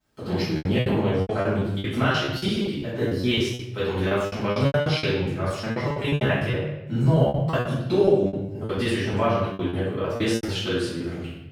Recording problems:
room echo; strong; dies away in 1 s
off-mic speech; far
choppy; very; 17% of the speech affected

